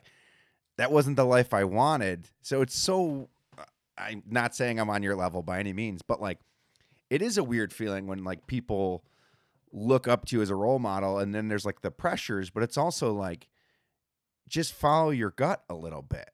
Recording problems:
none

